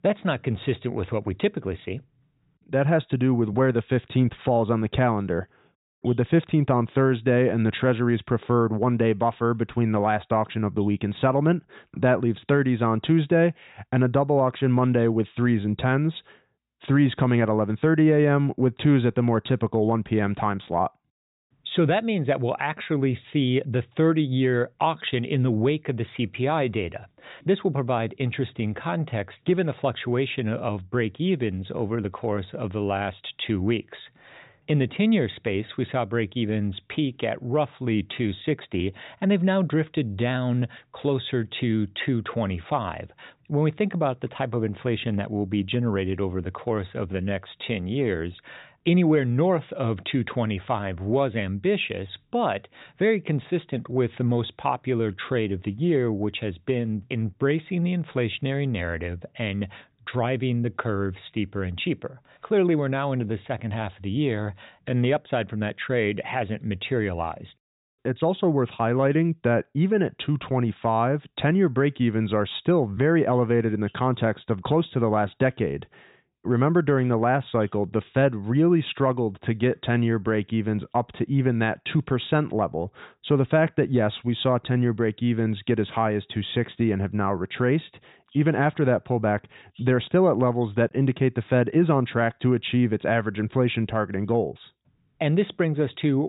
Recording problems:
high frequencies cut off; severe; nothing above 4 kHz
abrupt cut into speech; at the end

